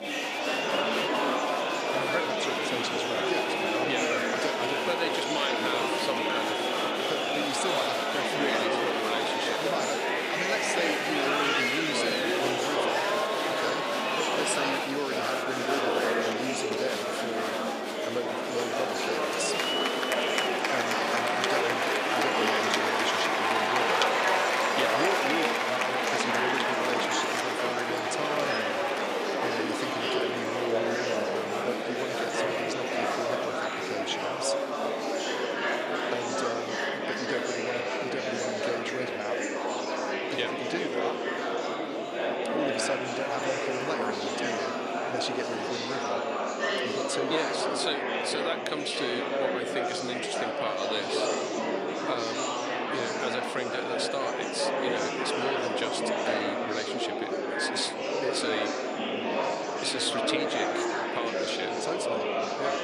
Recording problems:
thin; somewhat; fading below 300 Hz
murmuring crowd; very loud; throughout; 6 dB above the speech

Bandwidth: 15 kHz